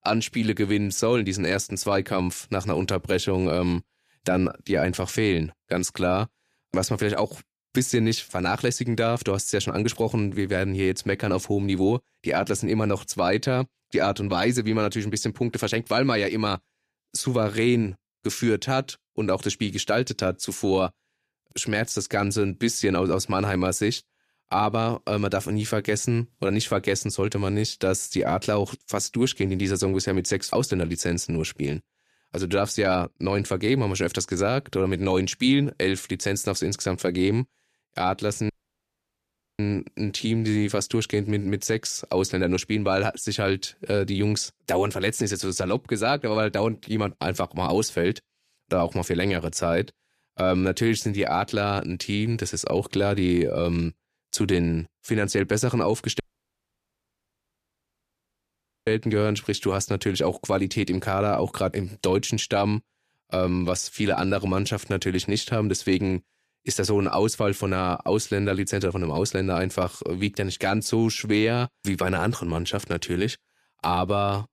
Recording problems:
audio cutting out; at 39 s for 1 s and at 56 s for 2.5 s

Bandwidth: 14.5 kHz